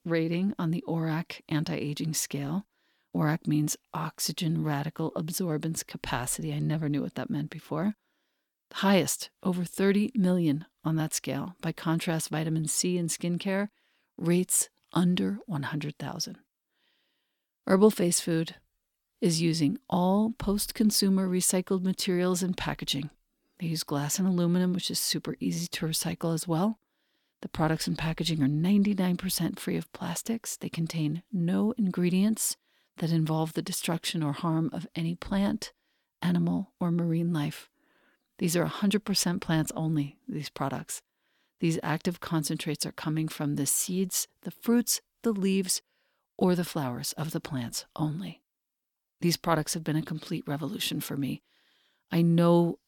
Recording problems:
none

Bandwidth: 17.5 kHz